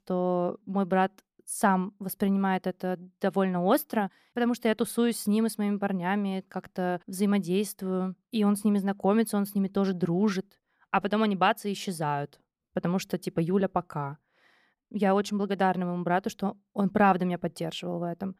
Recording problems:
none

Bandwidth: 15 kHz